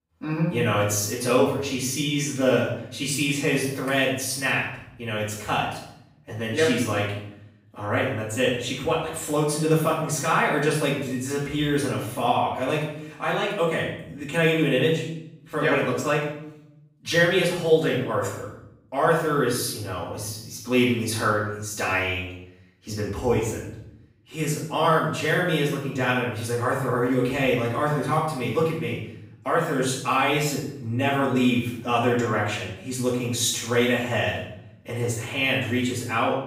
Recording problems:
off-mic speech; far
room echo; noticeable; dies away in 0.7 s

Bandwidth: 15.5 kHz